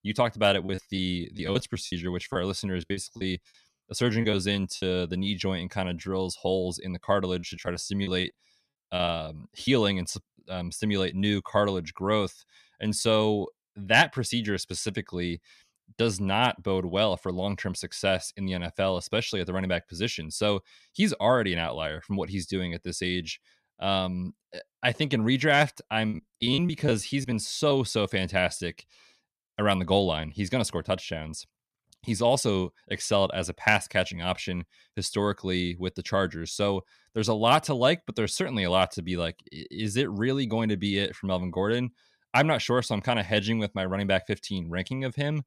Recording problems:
choppy; very; from 0.5 to 5 s, from 7.5 to 9.5 s and from 26 to 28 s; 19% of the speech affected

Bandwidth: 14.5 kHz